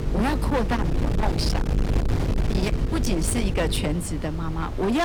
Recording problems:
distortion; heavy; 36% of the sound clipped
wind noise on the microphone; heavy; 6 dB below the speech
electrical hum; noticeable; until 4 s; 50 Hz, 10 dB below the speech
abrupt cut into speech; at the end

